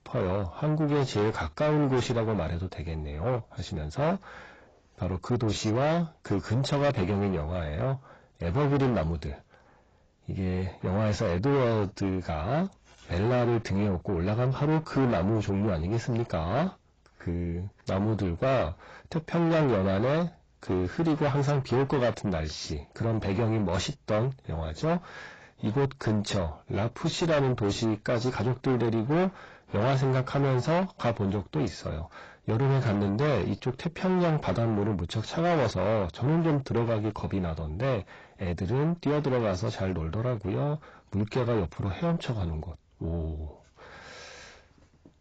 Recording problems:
distortion; heavy; 5 dB below the speech
garbled, watery; badly; nothing above 7.5 kHz

